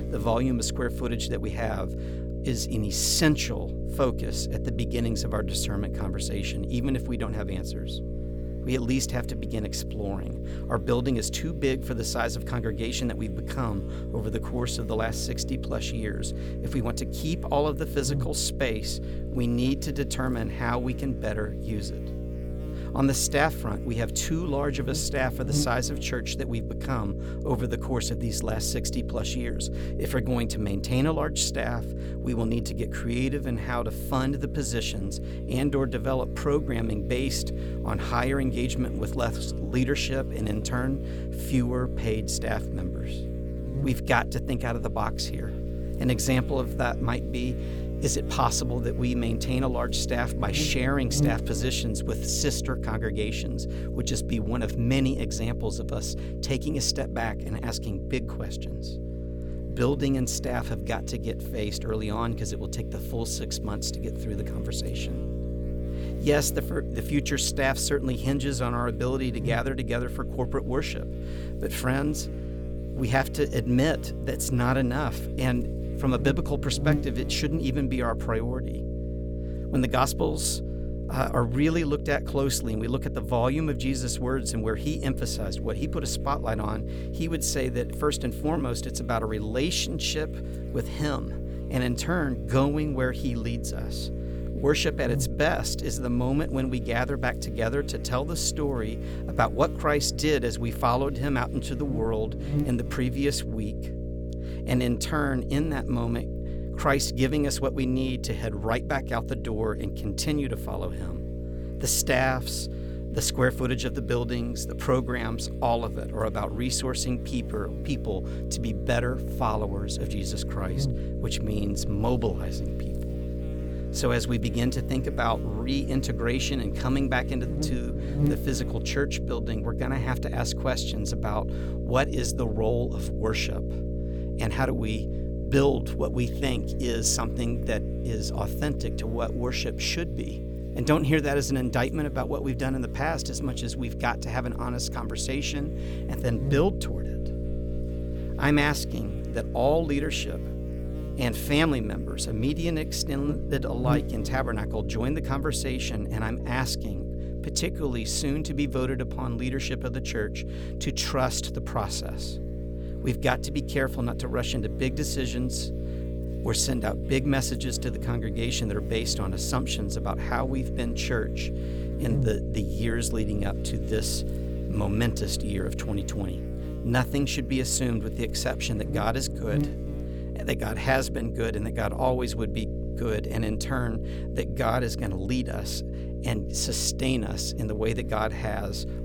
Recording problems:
electrical hum; noticeable; throughout; 60 Hz, 10 dB below the speech

